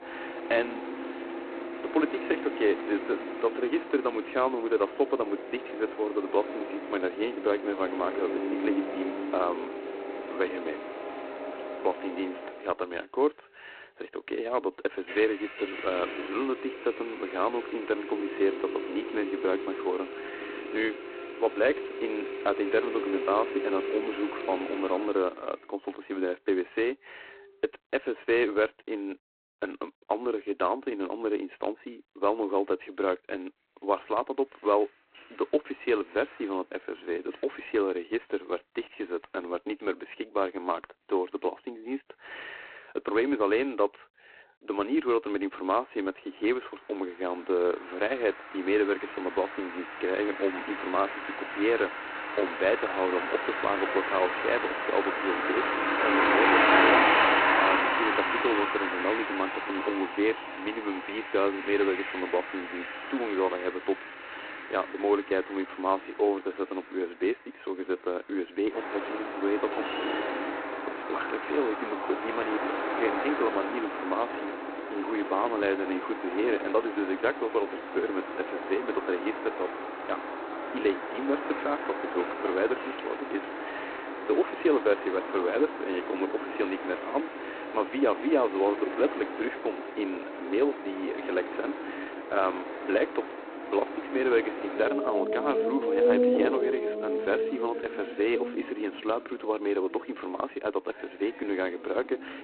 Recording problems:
phone-call audio; poor line; nothing above 4 kHz
traffic noise; loud; throughout; 2 dB below the speech

